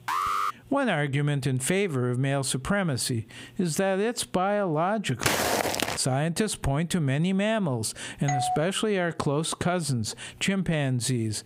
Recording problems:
squashed, flat; heavily
alarm; loud; at the start; peak level with the speech
footsteps; loud; at 5 s; peak 3 dB above the speech
doorbell; noticeable; at 8.5 s; peak 2 dB below the speech

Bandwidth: 15.5 kHz